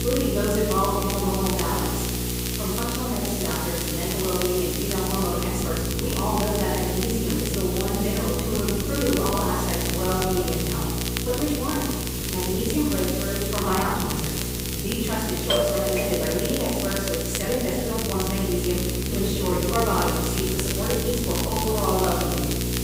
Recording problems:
room echo; strong; dies away in 1.2 s
off-mic speech; far
electrical hum; loud; throughout; 60 Hz, 8 dB below the speech
hiss; loud; throughout; 4 dB below the speech
crackle, like an old record; loud; 7 dB below the speech
uneven, jittery; strongly; from 5.5 to 22 s
doorbell; loud; from 16 to 17 s; peak 4 dB above the speech

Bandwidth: 15.5 kHz